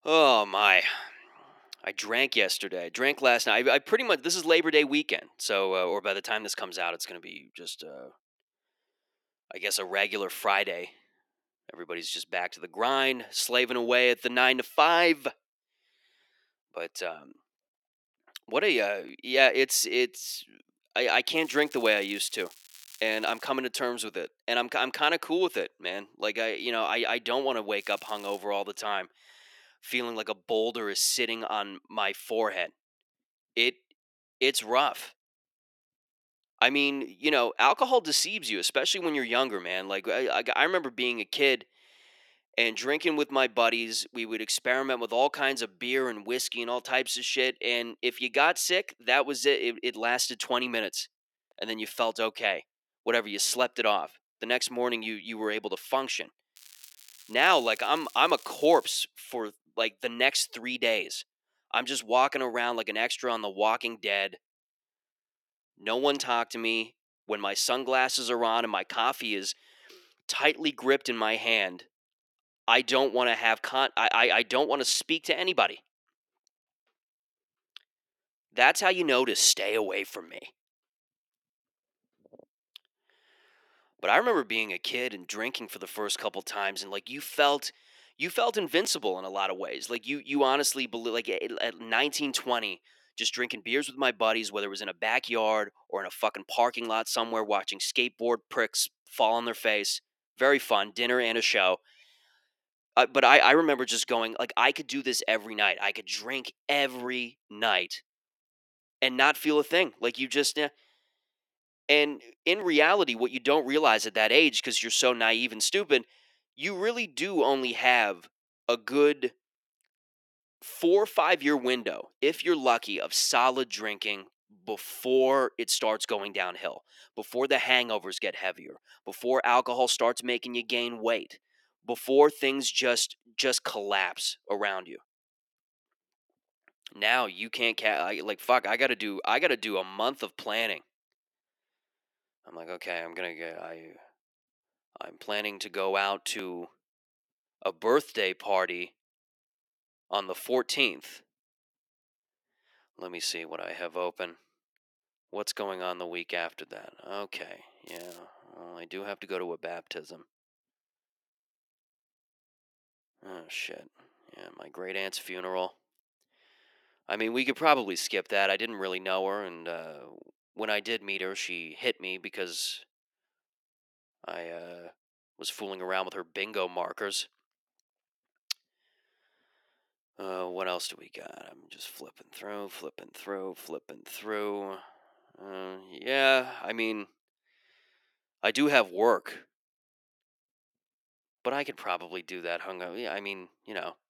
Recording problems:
thin; somewhat; fading below 350 Hz
crackling; faint; 4 times, first at 21 s; 25 dB below the speech

